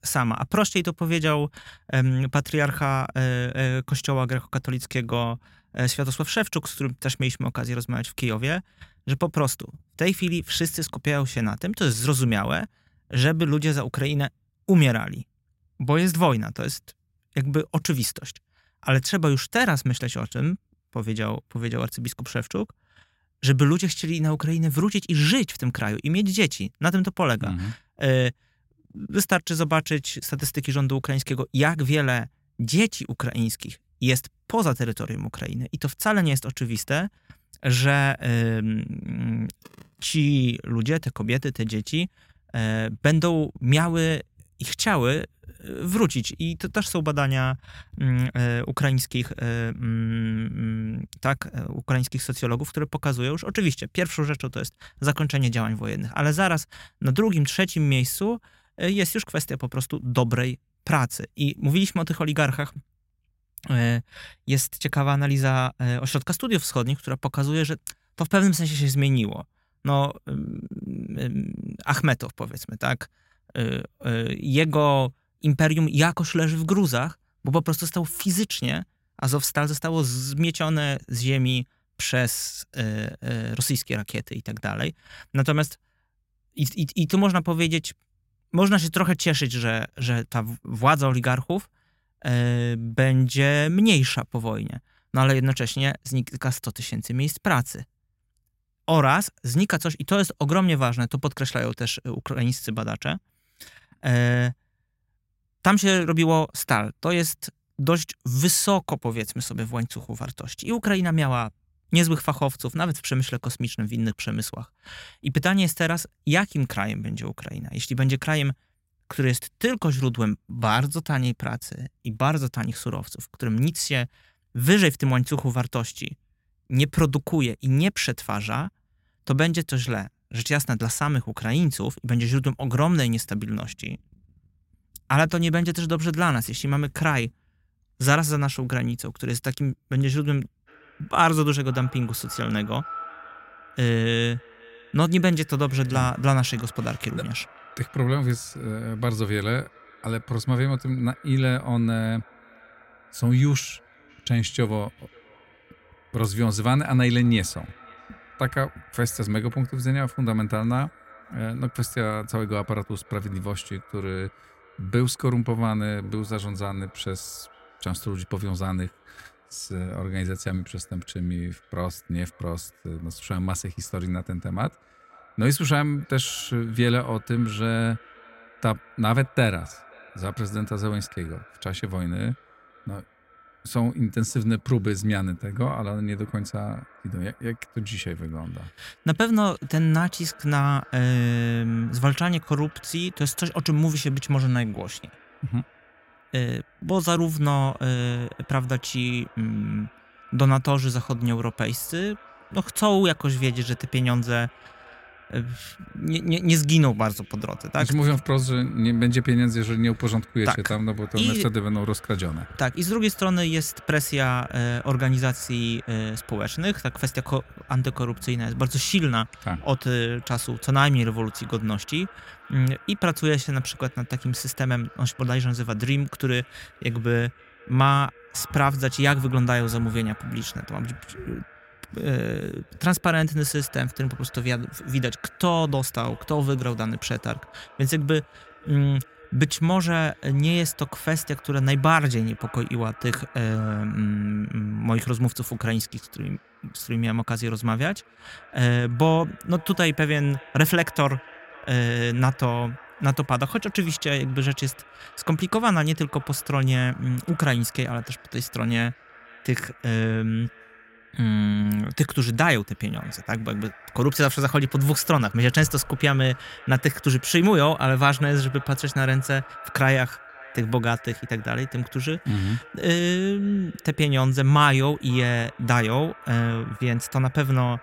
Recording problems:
echo of what is said; faint; from 2:21 on; 540 ms later, 25 dB below the speech

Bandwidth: 16 kHz